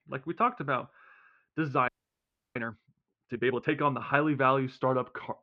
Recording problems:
muffled; very; fading above 3 kHz
audio freezing; at 2 s for 0.5 s

